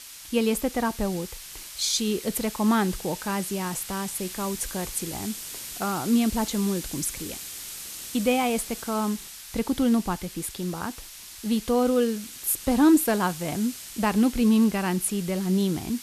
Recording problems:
hiss; noticeable; throughout; 10 dB below the speech

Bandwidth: 14 kHz